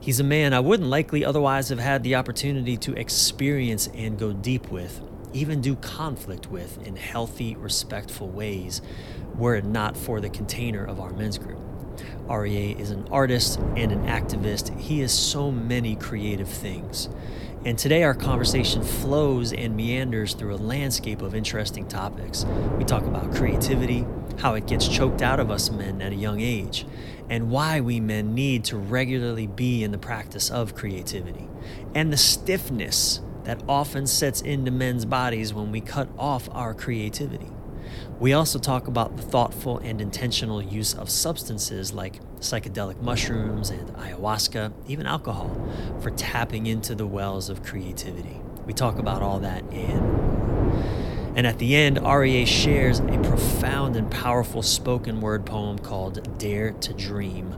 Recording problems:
wind noise on the microphone; occasional gusts; 10 dB below the speech

